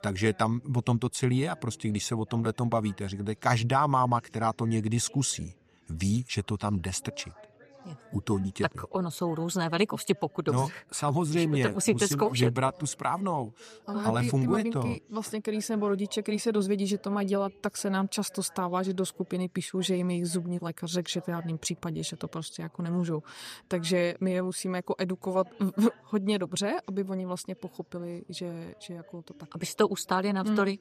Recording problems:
background chatter; faint; throughout; 4 voices, 25 dB below the speech

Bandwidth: 14.5 kHz